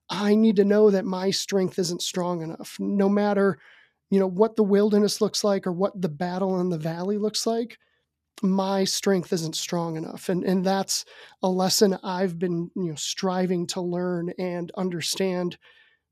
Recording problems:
none

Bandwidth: 14.5 kHz